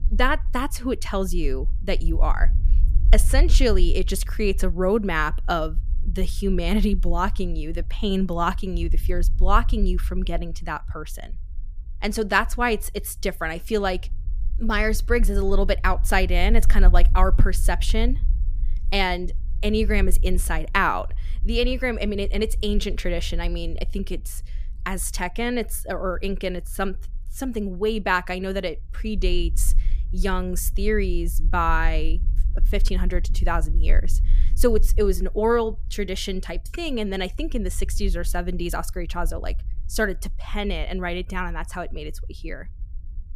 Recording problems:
low rumble; faint; throughout; 25 dB below the speech

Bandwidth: 14.5 kHz